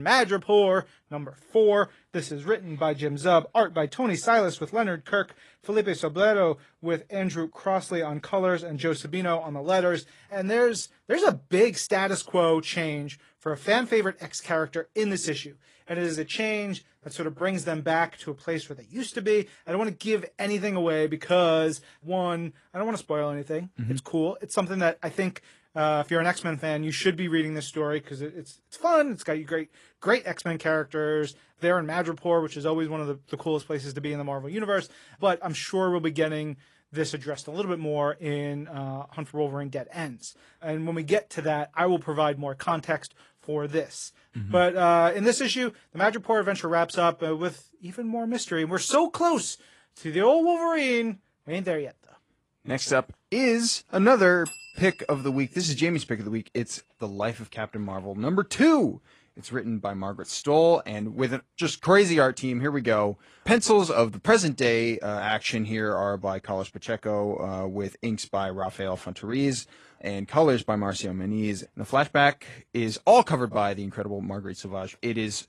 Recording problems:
garbled, watery; slightly; nothing above 11 kHz
abrupt cut into speech; at the start

